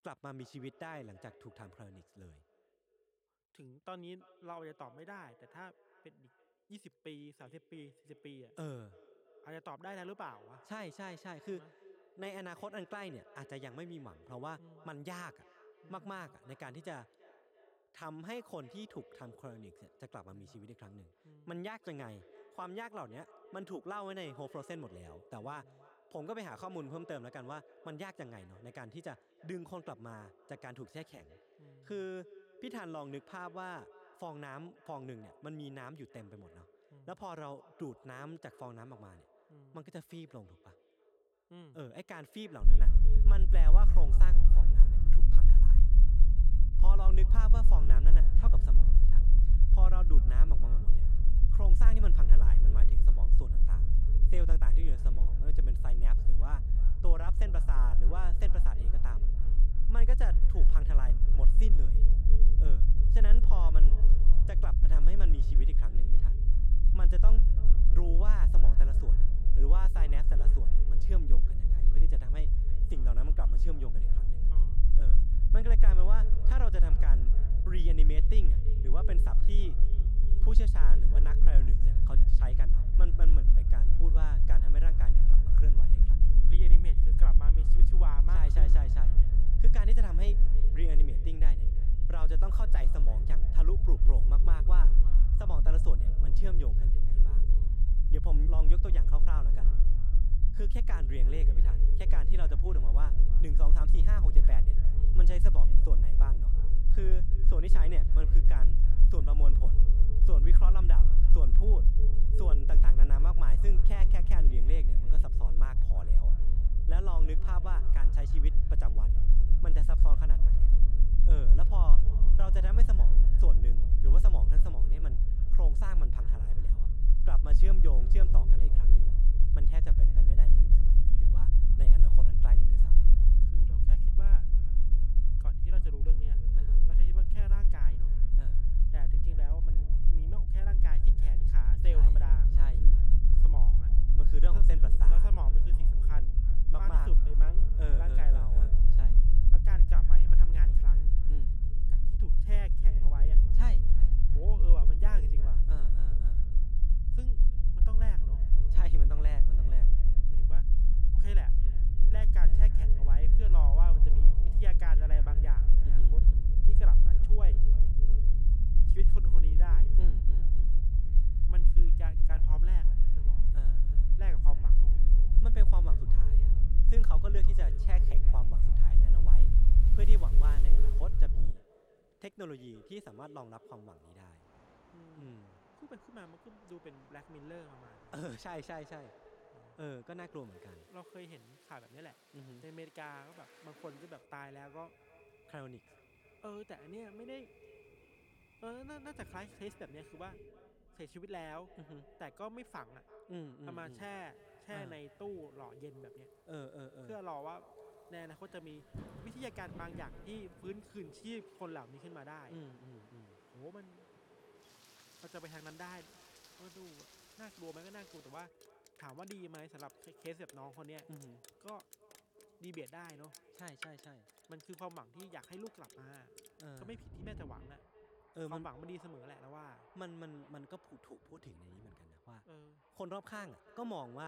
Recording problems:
echo of what is said; noticeable; throughout; 330 ms later, 15 dB below the speech
low rumble; loud; from 43 s to 3:02; 4 dB below the speech
rain or running water; noticeable; from 2:46 on; 15 dB below the speech
abrupt cut into speech; at the end

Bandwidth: 18 kHz